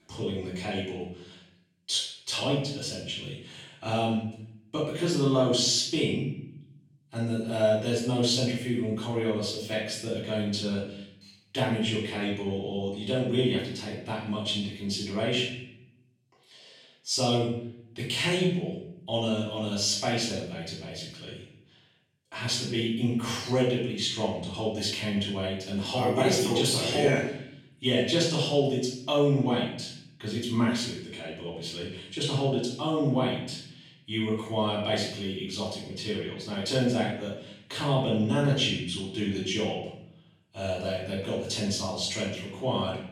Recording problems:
off-mic speech; far
room echo; noticeable; dies away in 0.7 s

